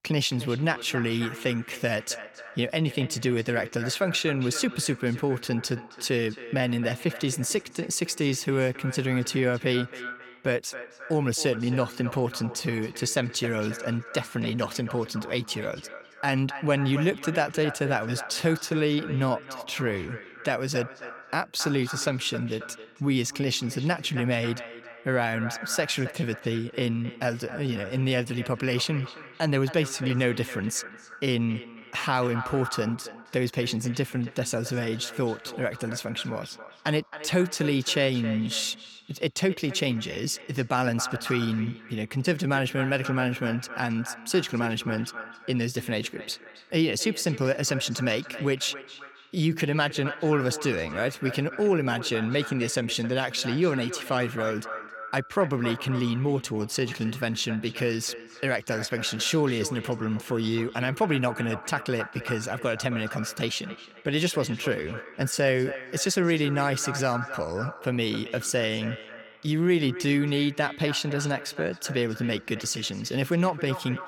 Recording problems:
echo of what is said; noticeable; throughout; 270 ms later, 15 dB below the speech

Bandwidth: 17.5 kHz